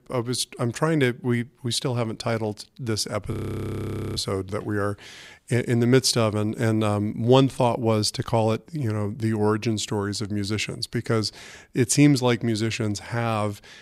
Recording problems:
audio freezing; at 3.5 s for 1 s

